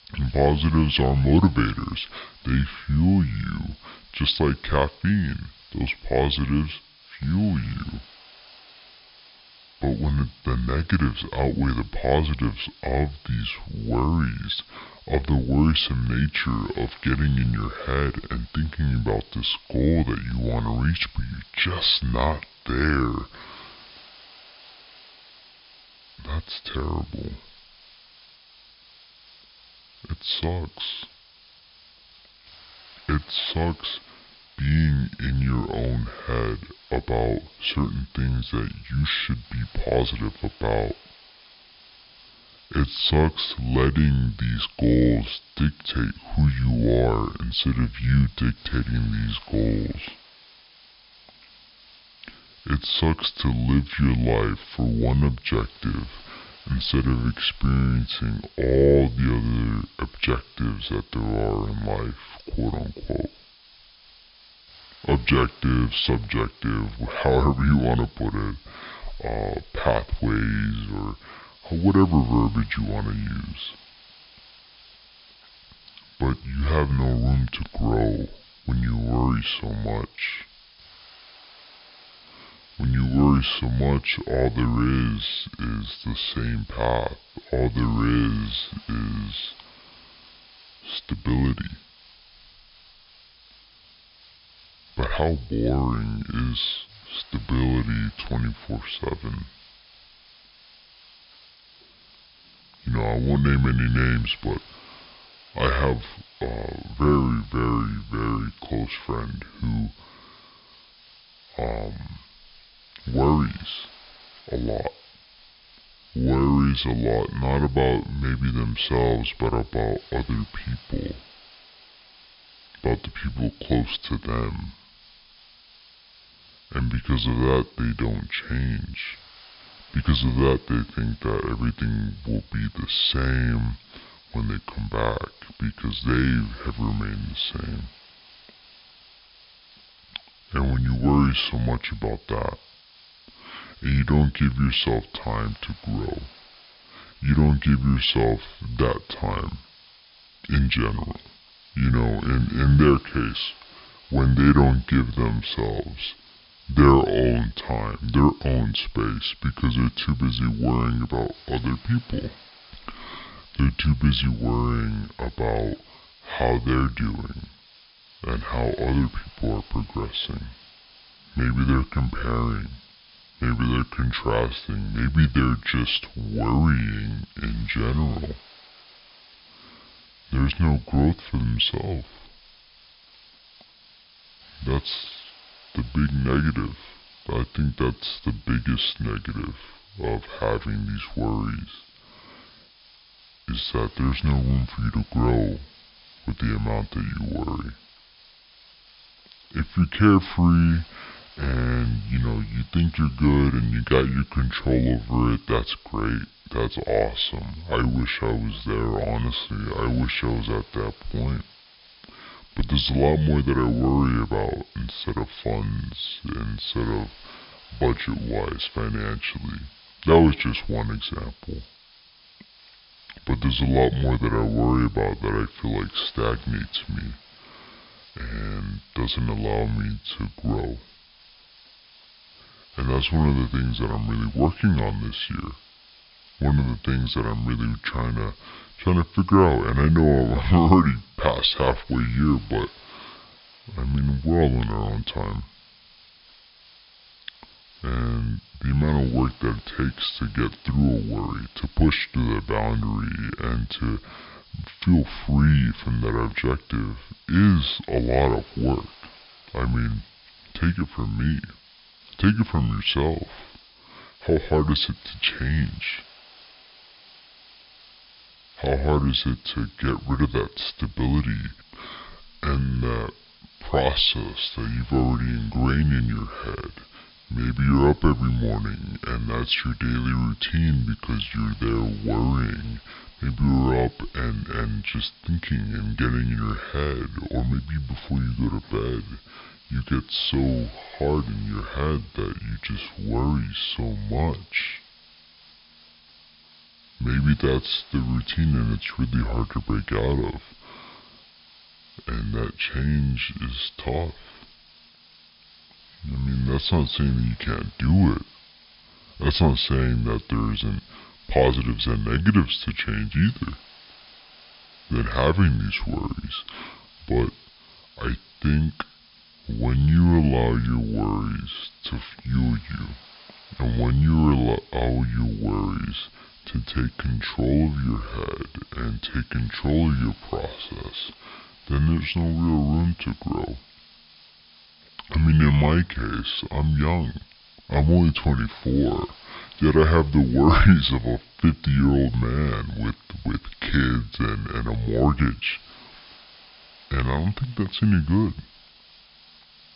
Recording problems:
wrong speed and pitch; too slow and too low; 0.7 times normal speed
high frequencies cut off; noticeable; nothing above 5.5 kHz
hiss; faint; throughout; 25 dB below the speech

